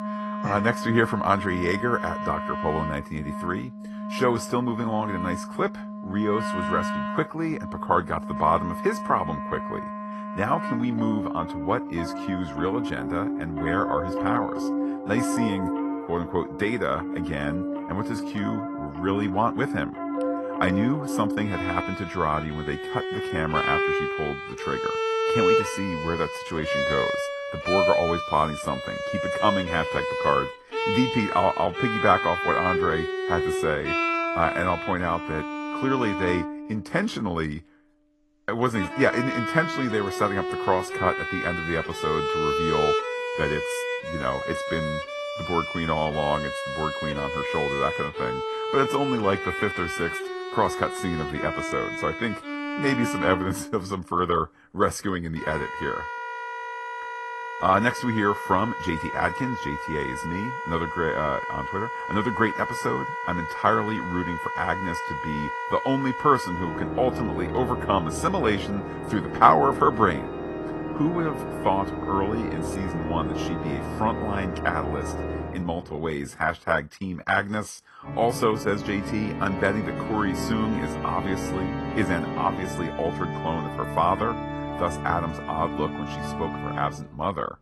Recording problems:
garbled, watery; slightly; nothing above 12.5 kHz
background music; loud; throughout; 3 dB below the speech

